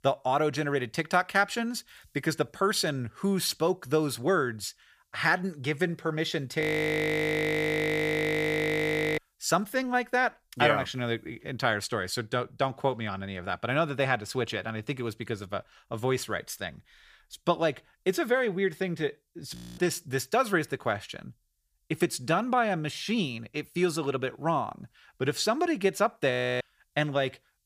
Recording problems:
audio freezing; at 6.5 s for 2.5 s, at 20 s and at 26 s

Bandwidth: 15 kHz